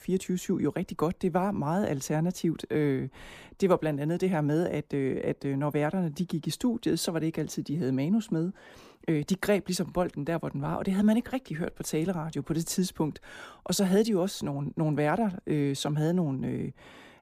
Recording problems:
none

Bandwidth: 15 kHz